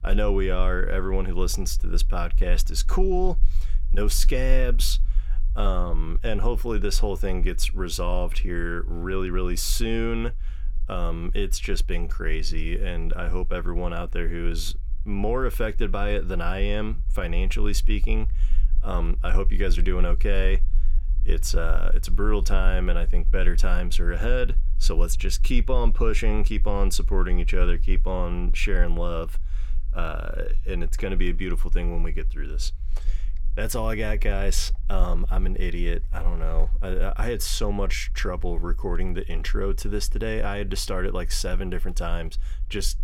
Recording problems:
low rumble; faint; throughout; 25 dB below the speech

